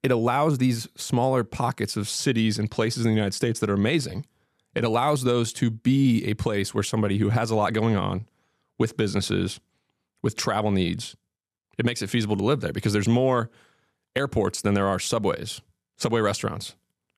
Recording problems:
none

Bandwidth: 14 kHz